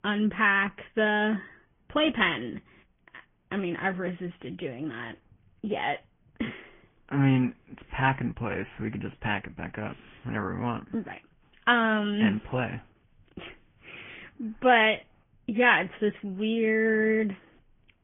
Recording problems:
high frequencies cut off; severe; nothing above 3.5 kHz
garbled, watery; slightly

